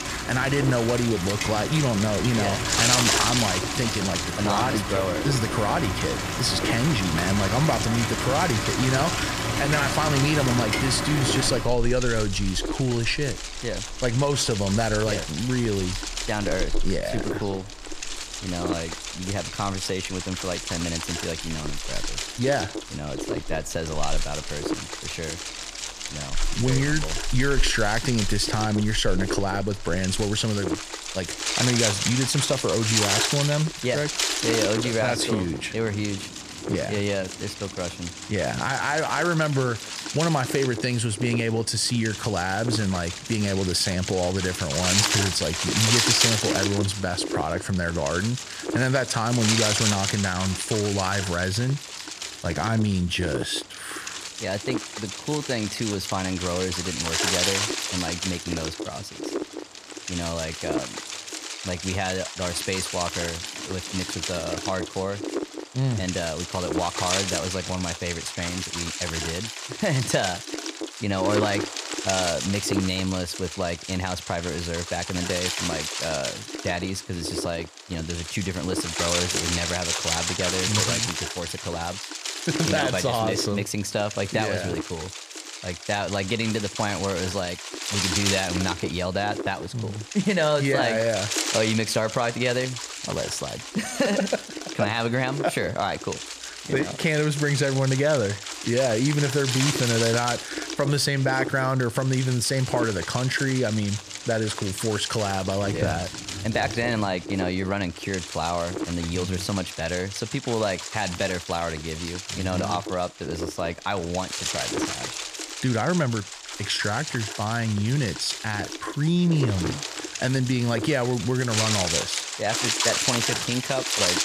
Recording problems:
wind noise on the microphone; heavy; 2 dB below the speech
rain or running water; loud; throughout; 6 dB below the speech

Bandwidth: 14.5 kHz